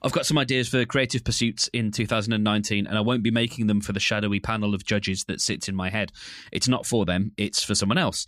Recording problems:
none

